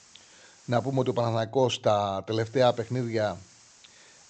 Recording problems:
high frequencies cut off; noticeable; nothing above 8 kHz
hiss; faint; until 1.5 s and from 2.5 s on; 25 dB below the speech

